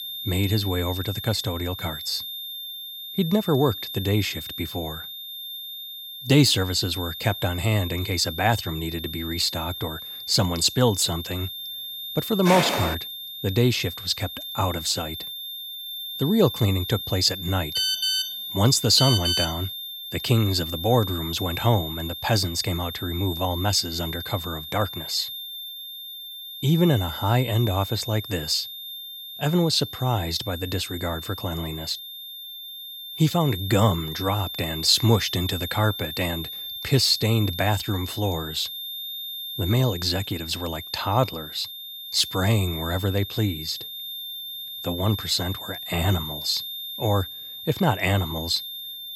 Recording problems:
high-pitched whine; loud; throughout; 3.5 kHz, 8 dB below the speech
footsteps; loud; at 12 s; peak 1 dB above the speech
phone ringing; loud; from 18 to 20 s; peak 3 dB above the speech

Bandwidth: 17 kHz